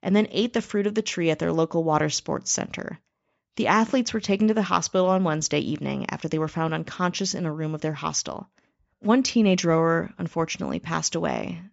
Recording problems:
high frequencies cut off; noticeable; nothing above 8 kHz

